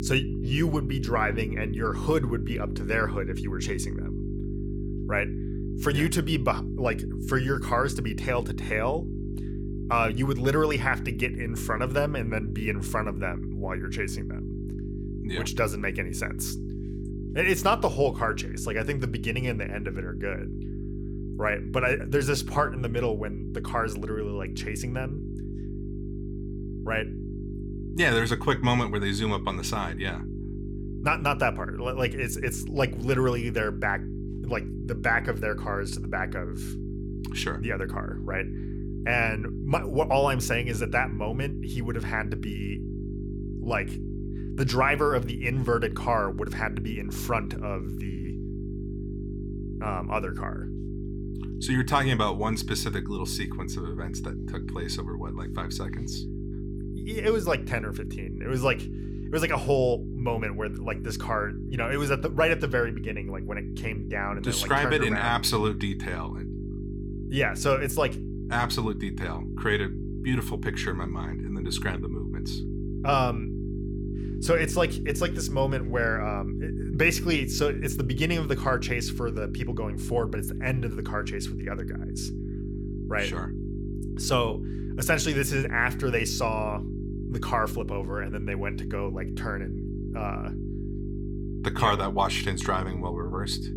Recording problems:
electrical hum; noticeable; throughout; 50 Hz, 15 dB below the speech

